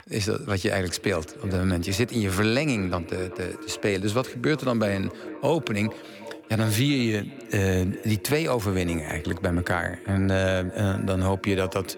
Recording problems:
echo of what is said; noticeable; throughout; 380 ms later, 15 dB below the speech

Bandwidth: 17.5 kHz